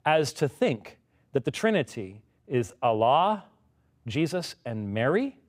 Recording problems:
uneven, jittery; strongly; from 0.5 to 5 s

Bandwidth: 15.5 kHz